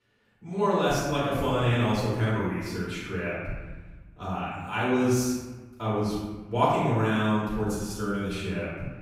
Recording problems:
room echo; strong; dies away in 1.3 s
off-mic speech; far

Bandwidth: 15.5 kHz